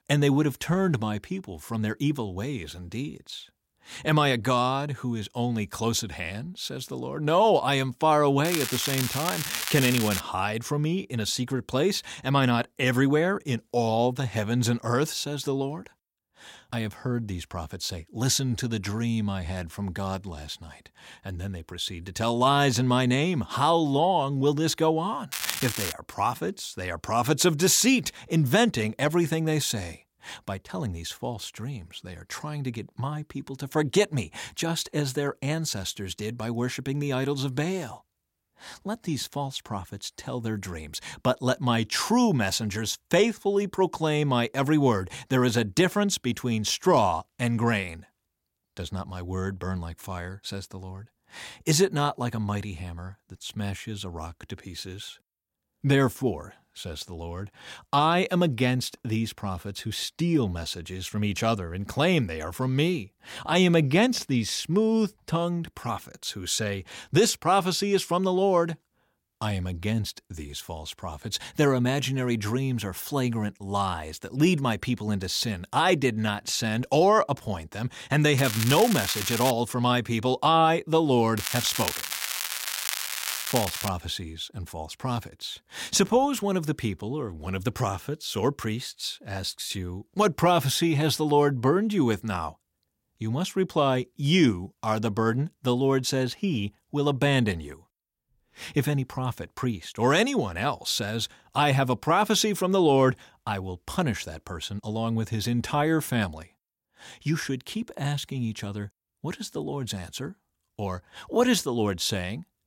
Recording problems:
crackling; loud; 4 times, first at 8.5 s; 3 dB below the speech

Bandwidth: 16.5 kHz